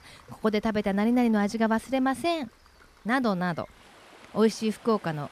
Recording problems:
rain or running water; faint; throughout; 25 dB below the speech

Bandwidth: 14.5 kHz